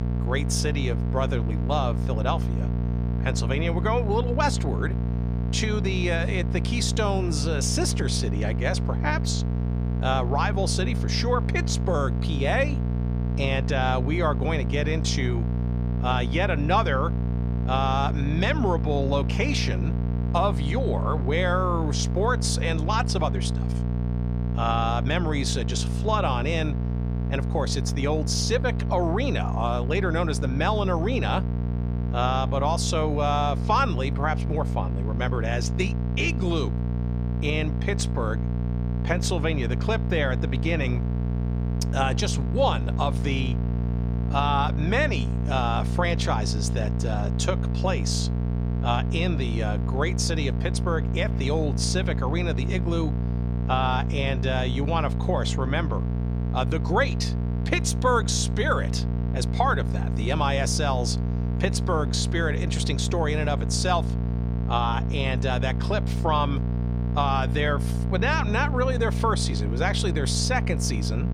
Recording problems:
electrical hum; noticeable; throughout; 60 Hz, 10 dB below the speech

